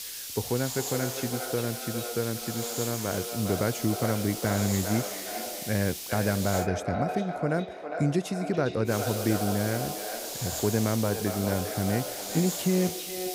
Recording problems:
echo of what is said; strong; throughout; 410 ms later, 7 dB below the speech
hiss; loud; until 6.5 s and from 9 s on; 5 dB below the speech

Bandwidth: 15.5 kHz